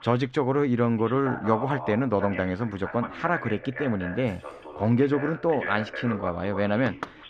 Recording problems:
muffled; slightly; fading above 3 kHz
voice in the background; noticeable; throughout; 10 dB below the speech
jangling keys; very faint; at 4 s; peak 35 dB below the speech
door banging; faint; at 7 s; peak 10 dB below the speech

